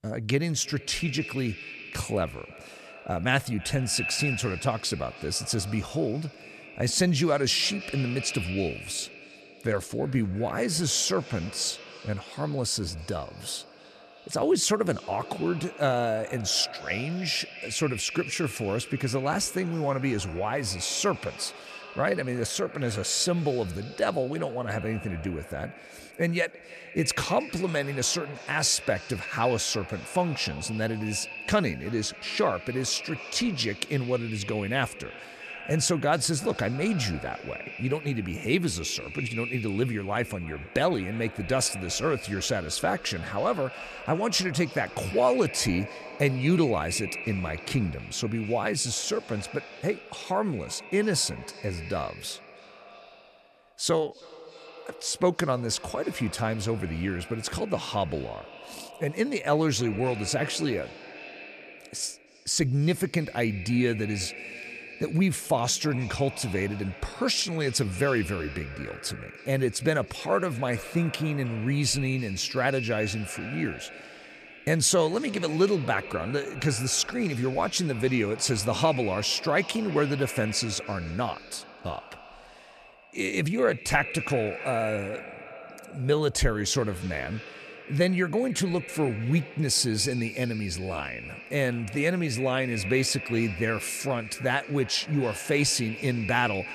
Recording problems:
echo of what is said; noticeable; throughout; 320 ms later, 10 dB below the speech

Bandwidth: 14.5 kHz